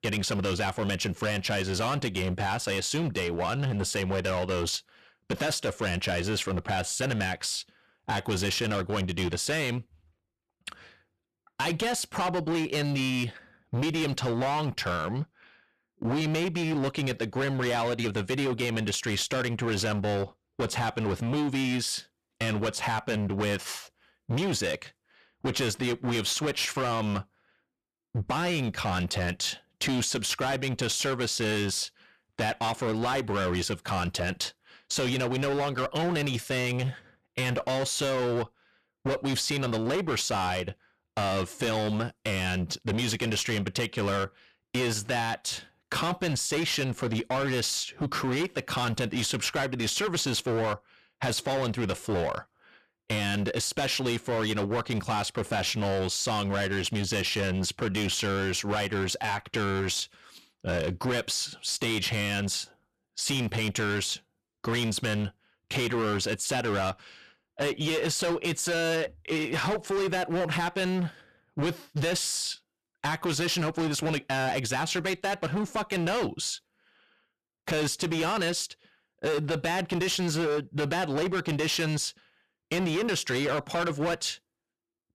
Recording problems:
distortion; heavy; 21% of the sound clipped

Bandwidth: 14 kHz